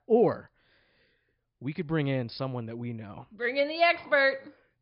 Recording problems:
high frequencies cut off; noticeable; nothing above 5.5 kHz

